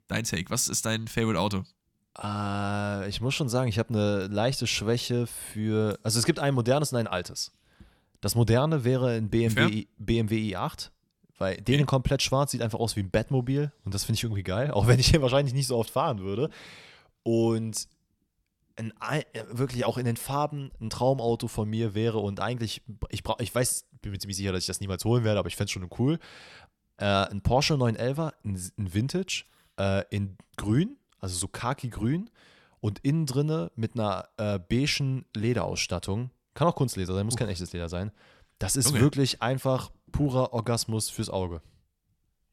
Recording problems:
none

